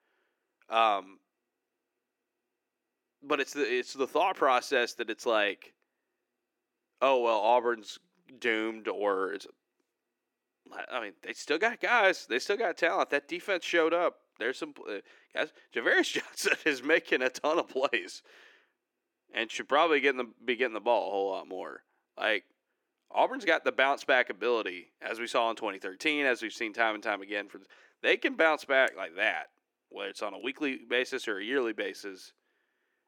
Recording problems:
thin; somewhat; fading below 300 Hz

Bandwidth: 17 kHz